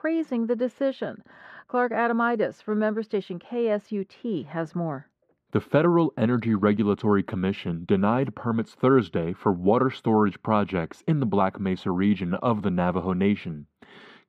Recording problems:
muffled; very; fading above 3.5 kHz

